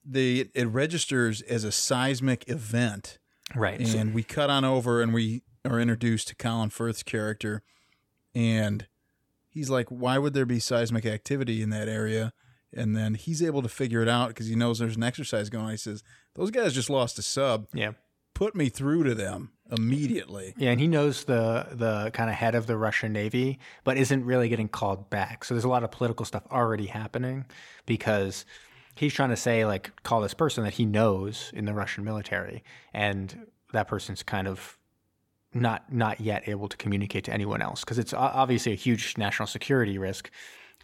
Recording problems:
none

